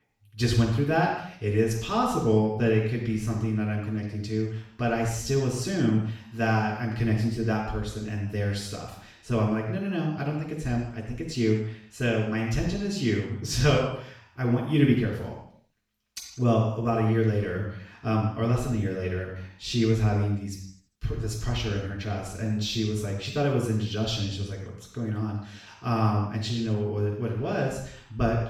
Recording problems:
off-mic speech; far
room echo; noticeable; dies away in 0.6 s

